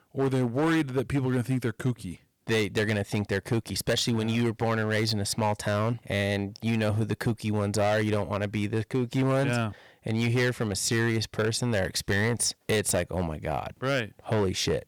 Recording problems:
distortion; slight; 9% of the sound clipped

